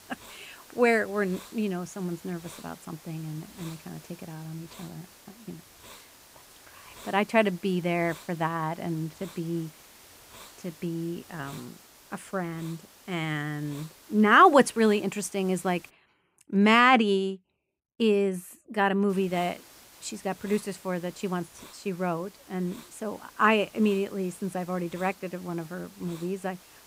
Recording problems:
hiss; faint; until 16 s and from 19 s on; 20 dB below the speech

